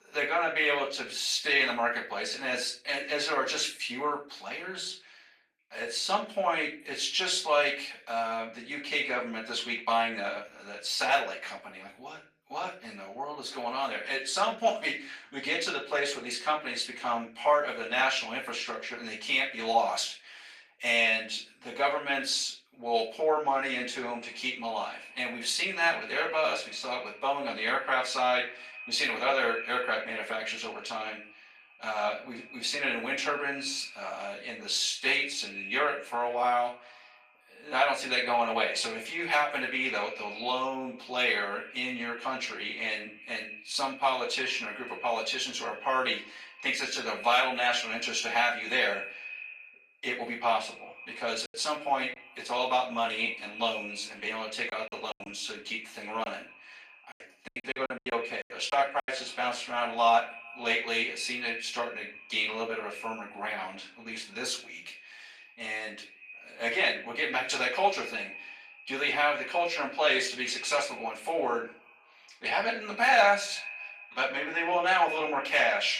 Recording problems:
off-mic speech; far
echo of what is said; noticeable; from 24 s on; 170 ms later, 15 dB below the speech
thin; somewhat; fading below 800 Hz
room echo; slight; dies away in 0.3 s
garbled, watery; slightly; nothing above 14.5 kHz
choppy; very; at 51 s and from 55 to 59 s; 17% of the speech affected

